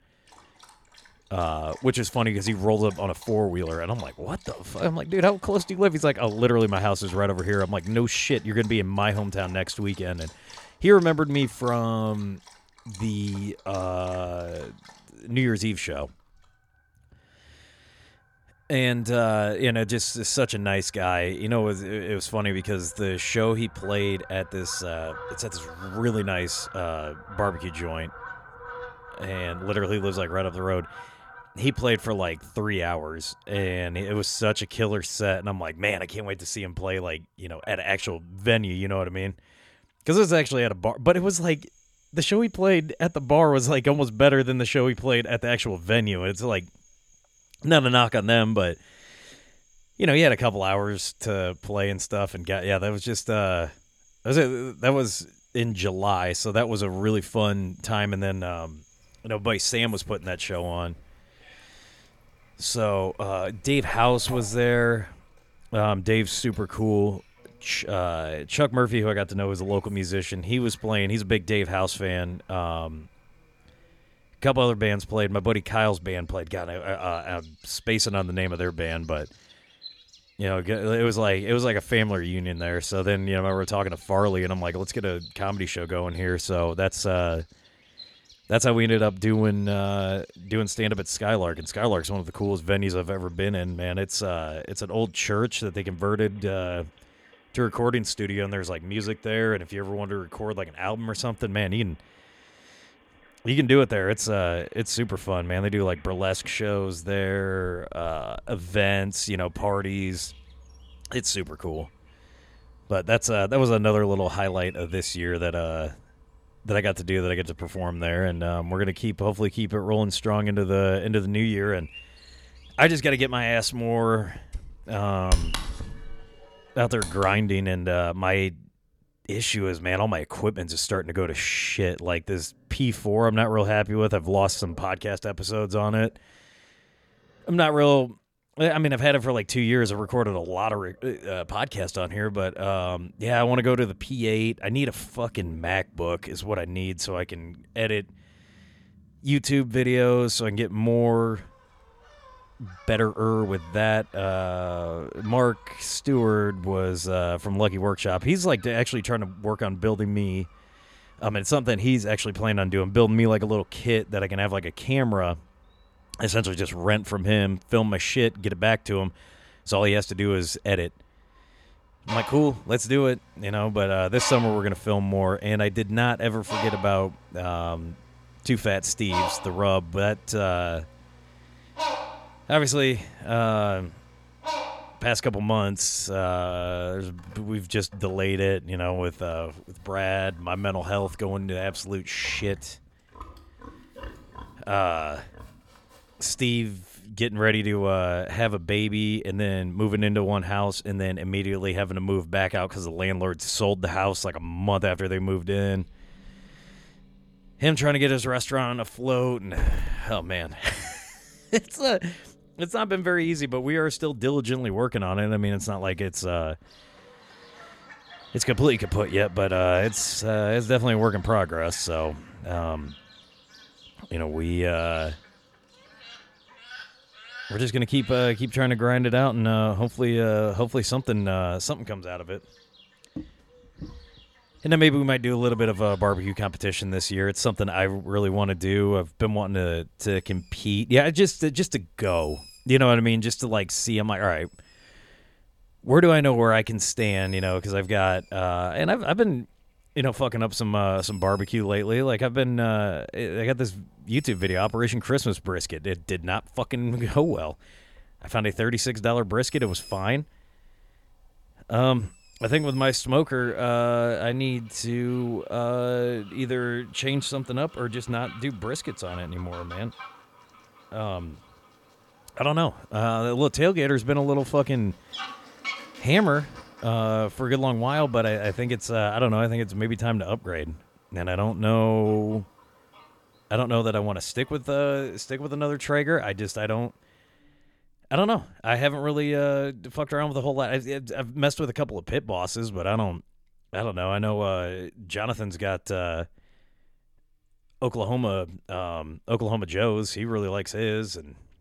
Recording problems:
animal sounds; noticeable; throughout; 20 dB below the speech

